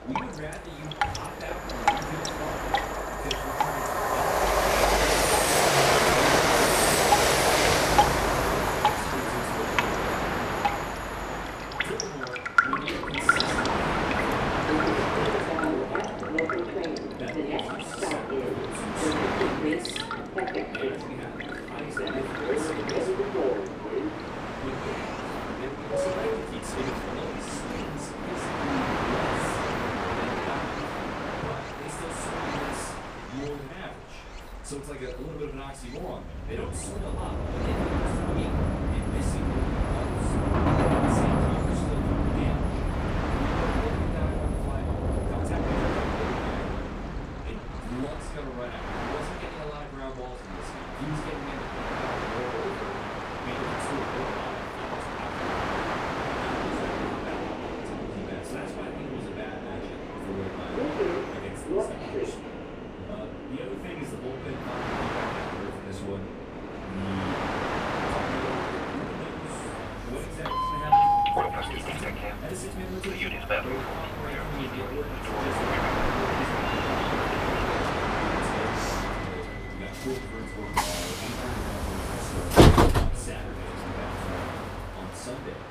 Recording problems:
off-mic speech; far
room echo; slight; dies away in 0.4 s
rain or running water; very loud; throughout; 6 dB above the speech
train or aircraft noise; very loud; throughout; 10 dB above the speech
uneven, jittery; strongly; from 6 s to 1:13

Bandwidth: 15 kHz